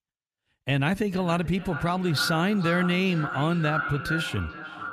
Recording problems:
echo of what is said; strong; throughout; 440 ms later, 7 dB below the speech

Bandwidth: 14.5 kHz